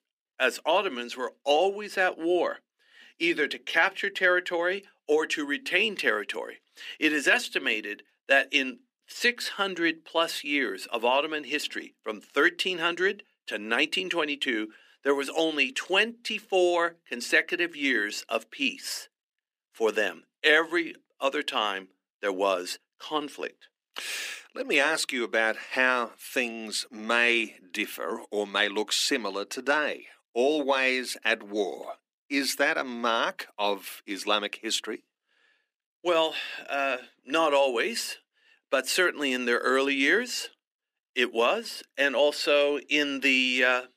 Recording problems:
thin; somewhat; fading below 250 Hz

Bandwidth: 15 kHz